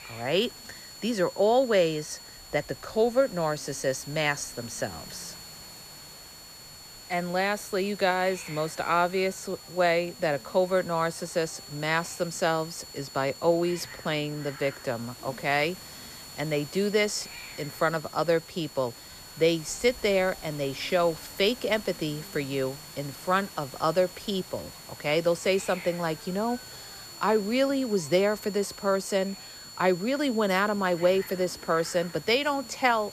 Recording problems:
high-pitched whine; noticeable; throughout; 4.5 kHz, 15 dB below the speech
hiss; noticeable; throughout; 20 dB below the speech

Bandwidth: 14.5 kHz